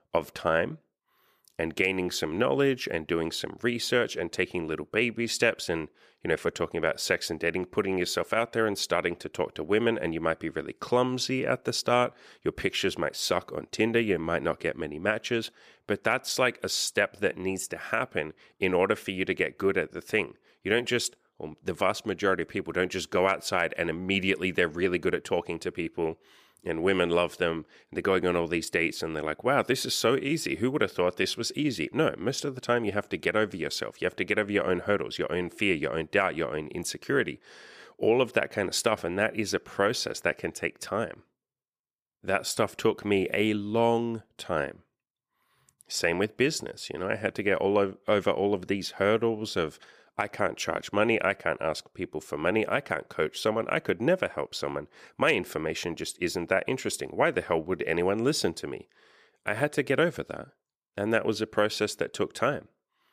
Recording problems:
none

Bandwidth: 14.5 kHz